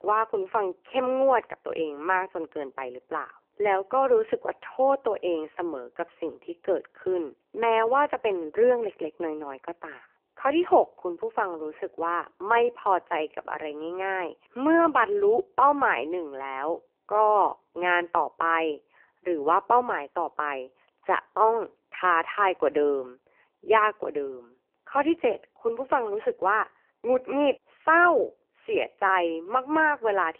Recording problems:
phone-call audio; poor line; nothing above 3 kHz

